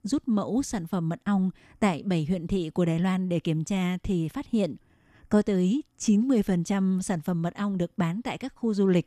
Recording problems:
none

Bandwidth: 14 kHz